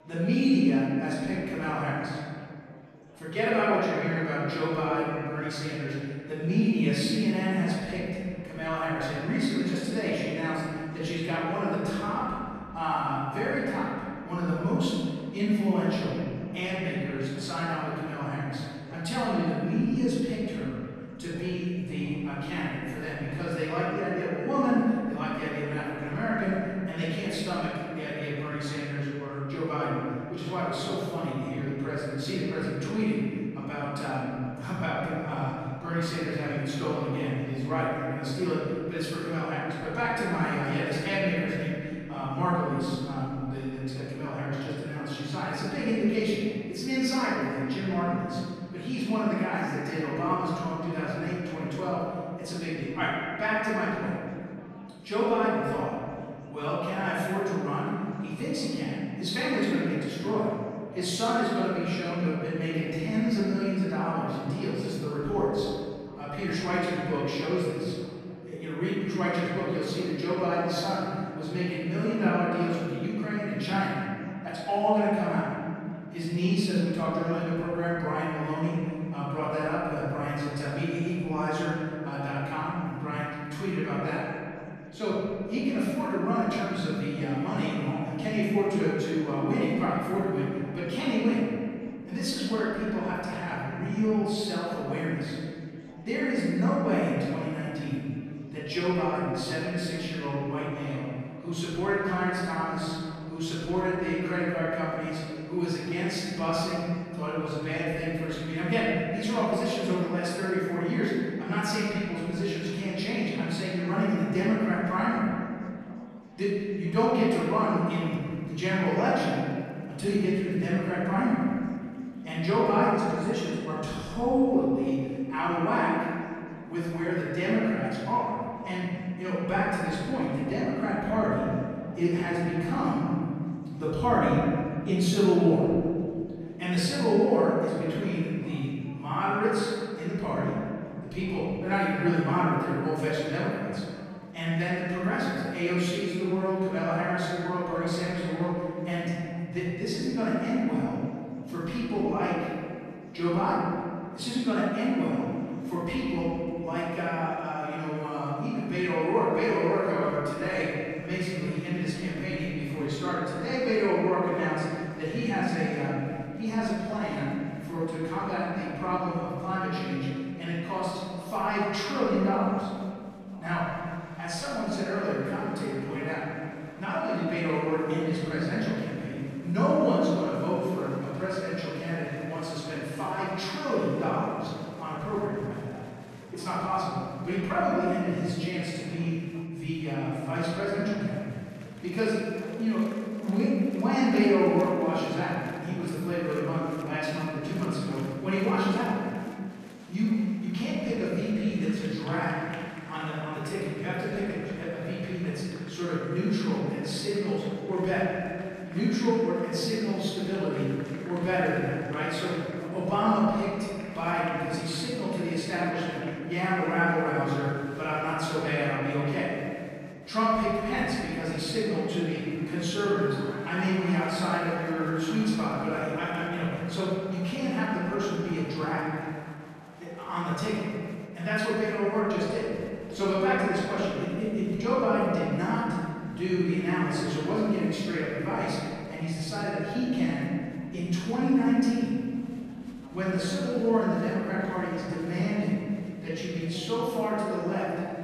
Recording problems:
room echo; strong; dies away in 2.1 s
off-mic speech; far
murmuring crowd; faint; throughout; 20 dB below the speech

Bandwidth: 13.5 kHz